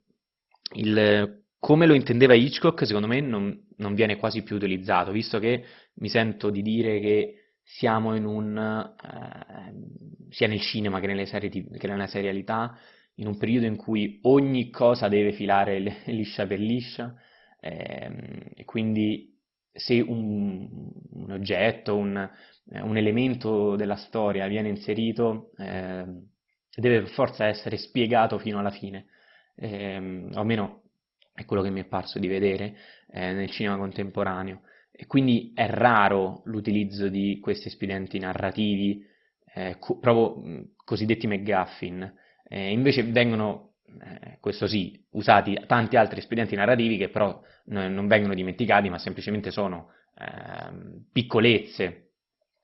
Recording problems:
garbled, watery; badly; nothing above 5.5 kHz

